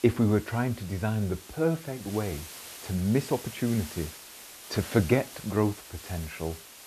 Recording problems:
hiss; noticeable; throughout; 15 dB below the speech

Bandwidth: 14 kHz